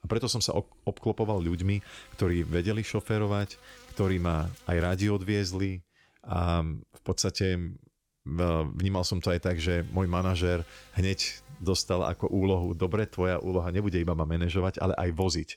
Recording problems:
electrical hum; faint; from 1 to 5.5 s and from 9.5 to 14 s; 50 Hz, 25 dB below the speech

